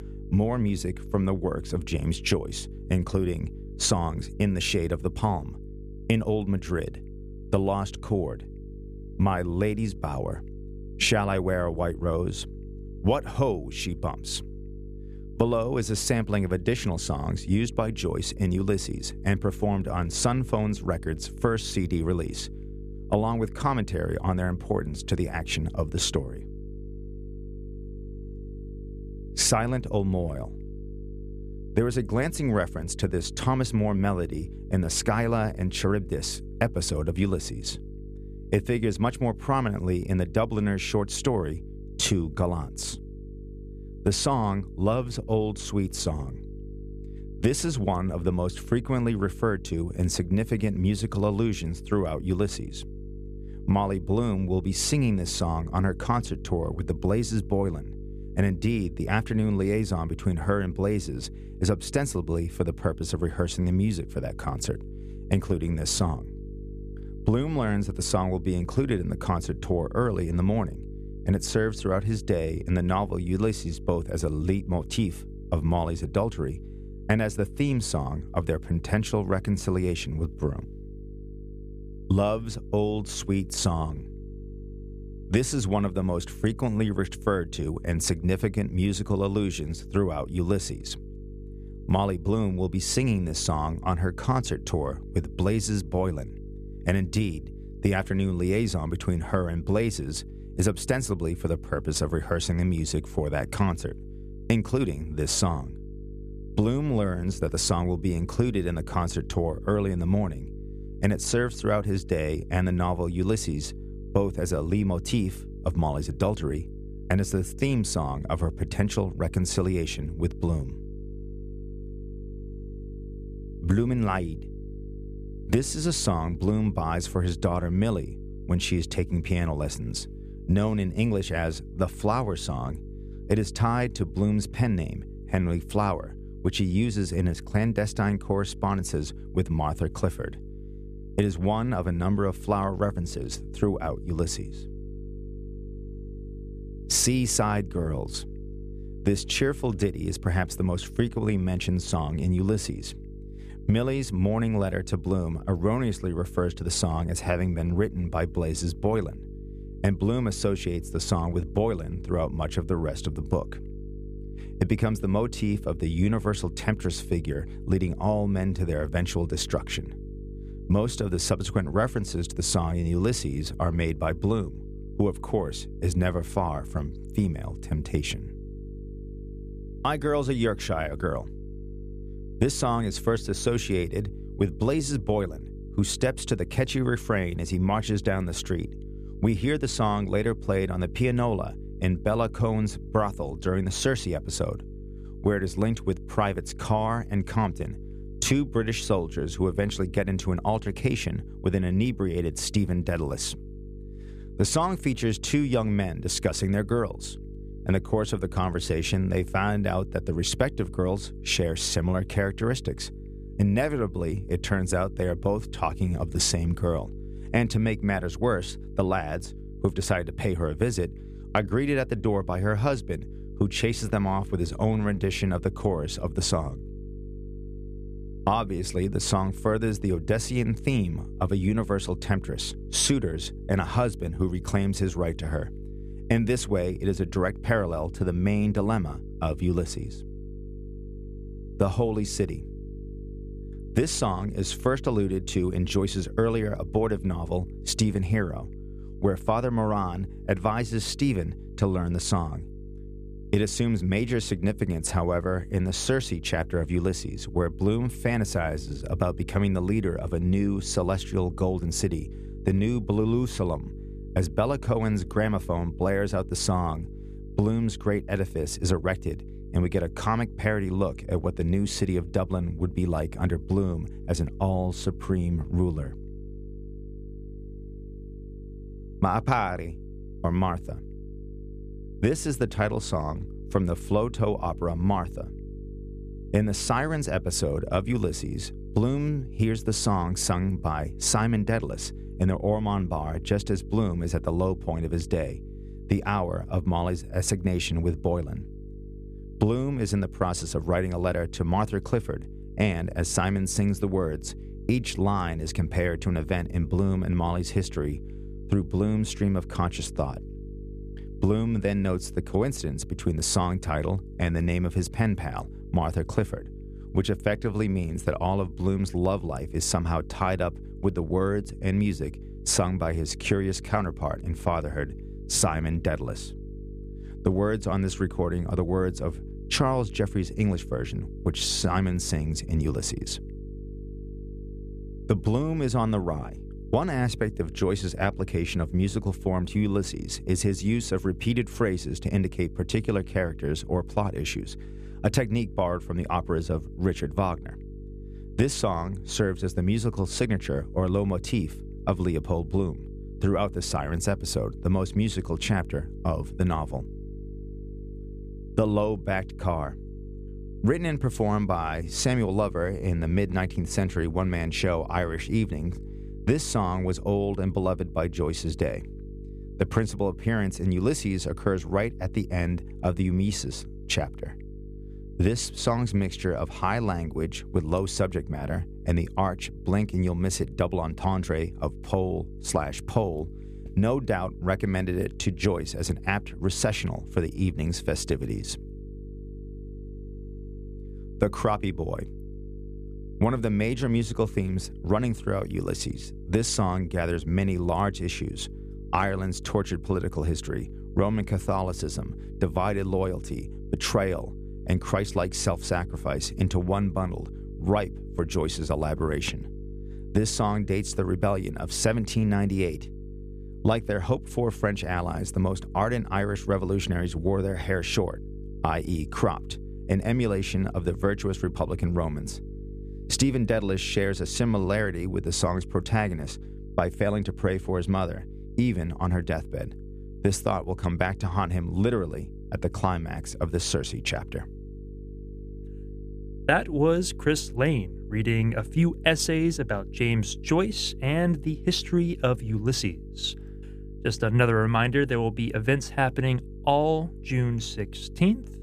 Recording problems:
electrical hum; noticeable; throughout; 50 Hz, 20 dB below the speech

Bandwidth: 14.5 kHz